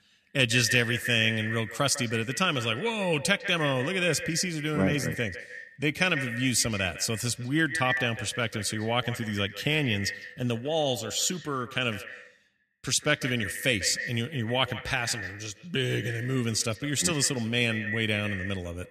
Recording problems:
echo of what is said; strong; throughout; 150 ms later, 9 dB below the speech

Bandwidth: 14 kHz